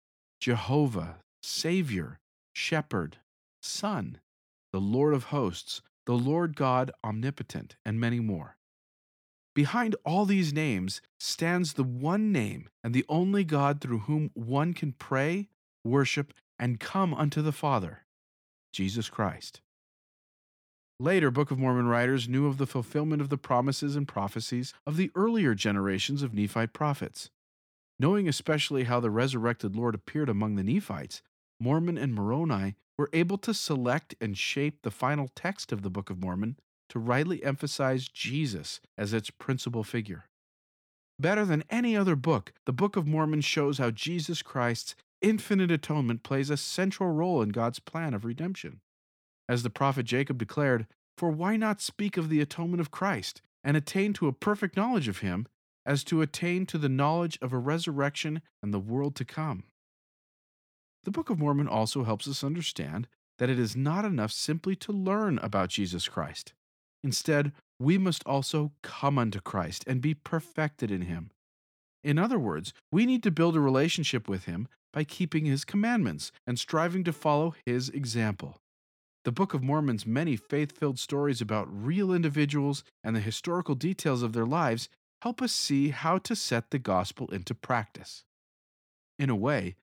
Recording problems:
none

